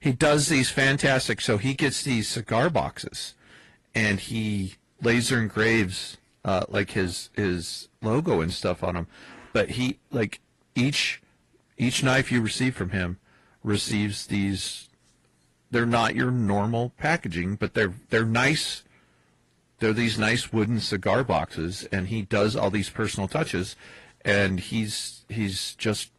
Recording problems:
distortion; slight; 10 dB below the speech
garbled, watery; slightly; nothing above 11 kHz

